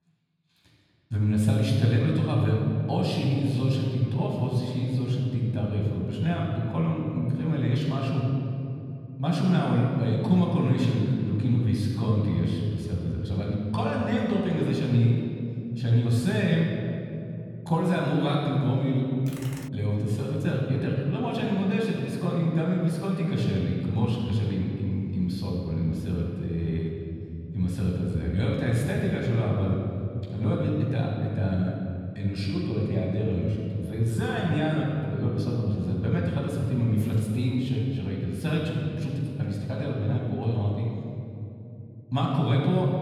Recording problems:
off-mic speech; far
room echo; noticeable; dies away in 3 s
keyboard typing; faint; at 19 s; peak 15 dB below the speech

